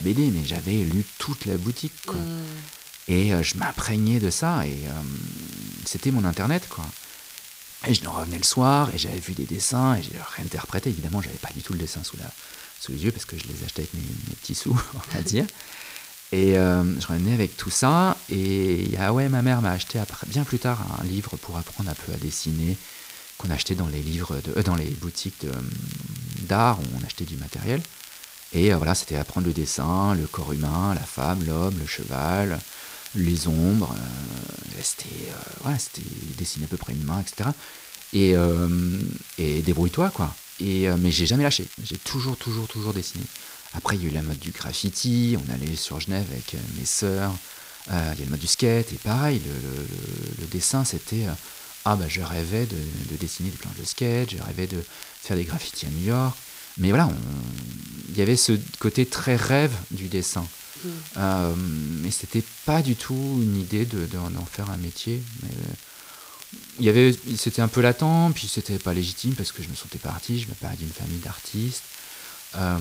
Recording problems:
hiss; noticeable; throughout; 15 dB below the speech
crackle, like an old record; faint; 20 dB below the speech
abrupt cut into speech; at the start and the end
uneven, jittery; strongly; from 1.5 s to 1:07

